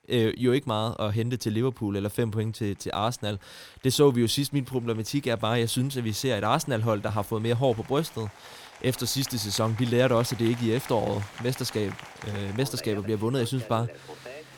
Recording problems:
crowd noise; noticeable; throughout; 20 dB below the speech

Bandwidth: 18.5 kHz